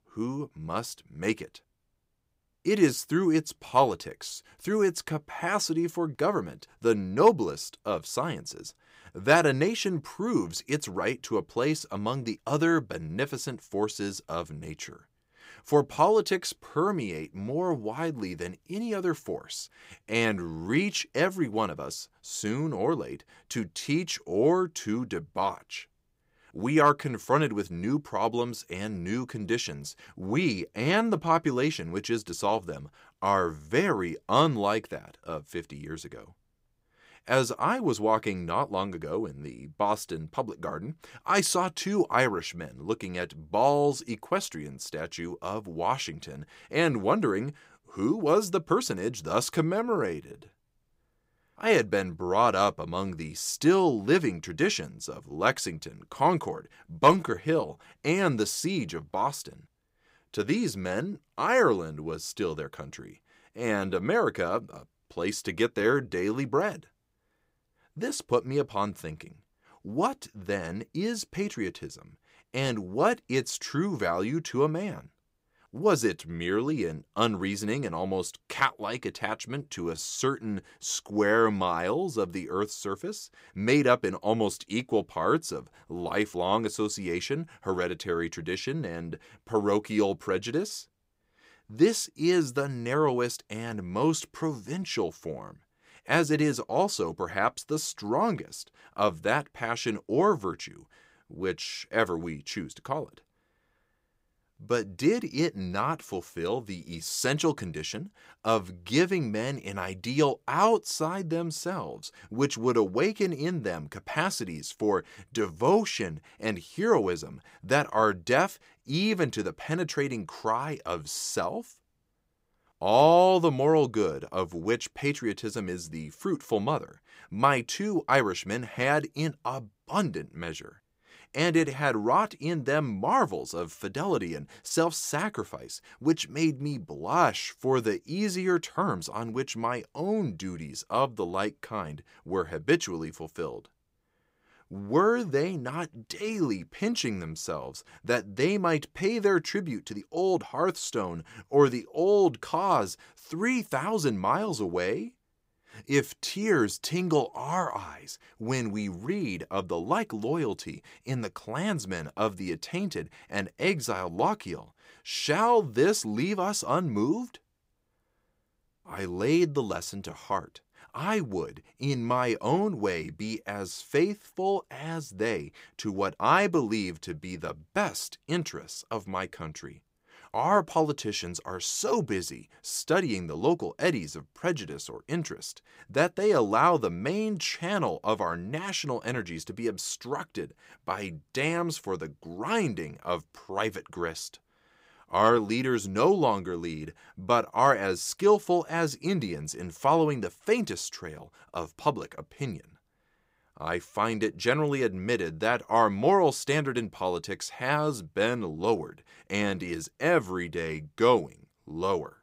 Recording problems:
uneven, jittery; strongly; from 20 s to 2:31

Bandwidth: 15.5 kHz